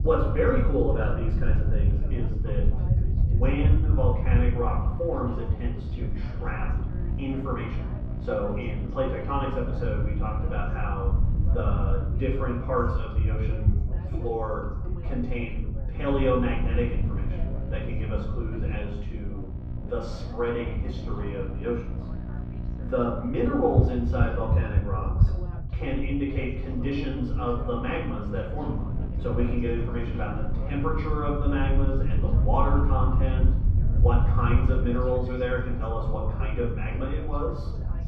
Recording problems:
off-mic speech; far
muffled; very; fading above 4 kHz
room echo; noticeable; dies away in 0.7 s
electrical hum; noticeable; from 4.5 to 13 s, from 16 to 25 s and from 28 to 35 s; 60 Hz, 15 dB below the speech
background chatter; noticeable; throughout; 3 voices, 15 dB below the speech
low rumble; noticeable; throughout; 15 dB below the speech

